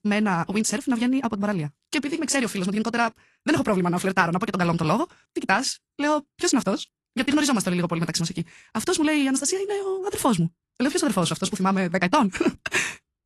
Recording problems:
wrong speed, natural pitch; too fast; 1.7 times normal speed
garbled, watery; slightly; nothing above 11.5 kHz

